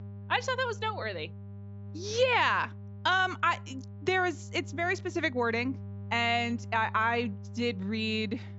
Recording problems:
high frequencies cut off; noticeable; nothing above 8 kHz
electrical hum; faint; throughout; 50 Hz, 25 dB below the speech

